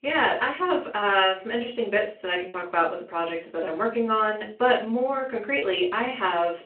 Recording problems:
off-mic speech; far
room echo; slight; dies away in 0.3 s
phone-call audio
choppy; occasionally; 2% of the speech affected

